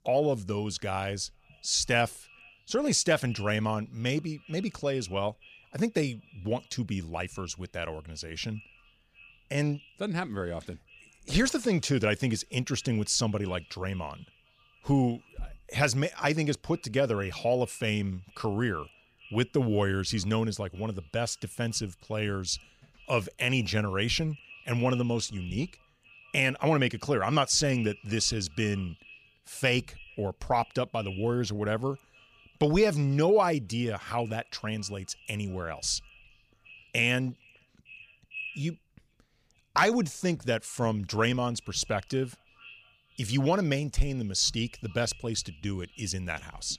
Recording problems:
echo of what is said; faint; throughout; 450 ms later, 20 dB below the speech

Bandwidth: 15 kHz